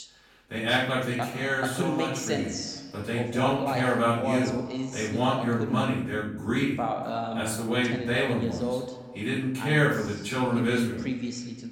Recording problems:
off-mic speech; far
room echo; noticeable; dies away in 0.6 s
voice in the background; loud; throughout; 5 dB below the speech

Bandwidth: 17.5 kHz